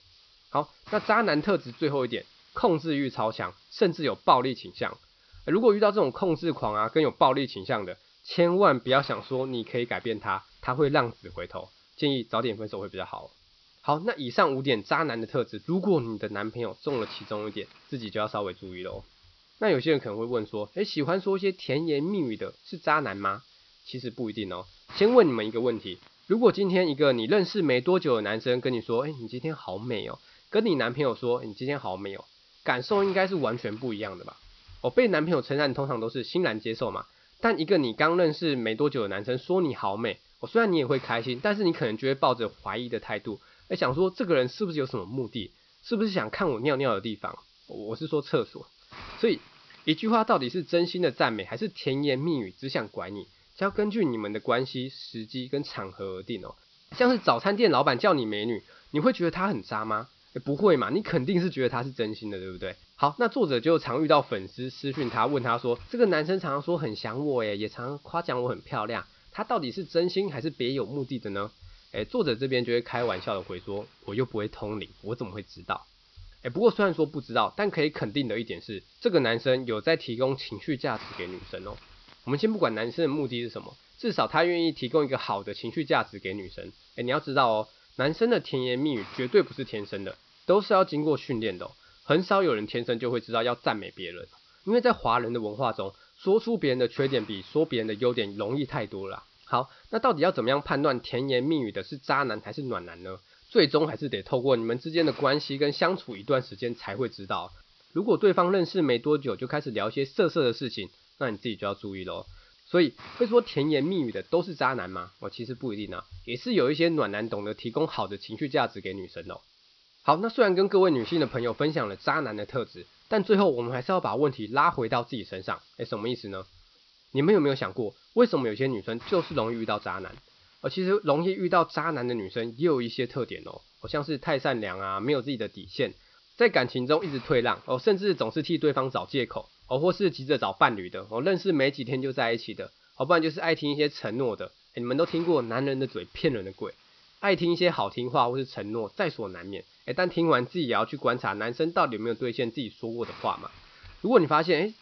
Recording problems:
high frequencies cut off; noticeable; nothing above 5.5 kHz
hiss; faint; throughout; 25 dB below the speech

